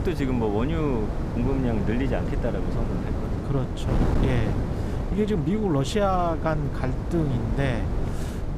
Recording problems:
wind noise on the microphone; heavy; 6 dB below the speech

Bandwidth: 14.5 kHz